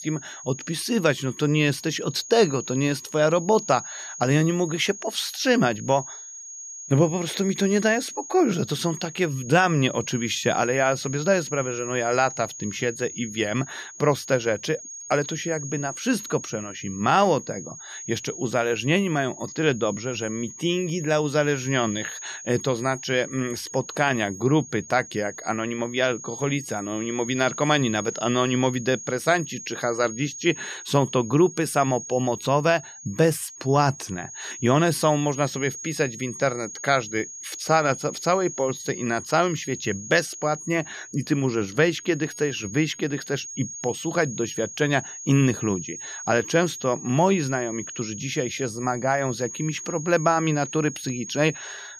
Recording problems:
high-pitched whine; noticeable; throughout; 6.5 kHz, 10 dB below the speech

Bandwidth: 14.5 kHz